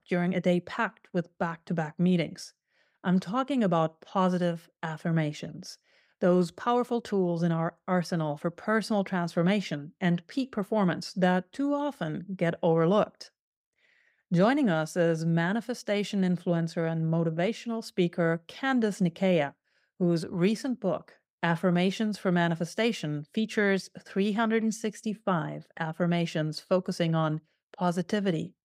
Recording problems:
none

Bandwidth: 15.5 kHz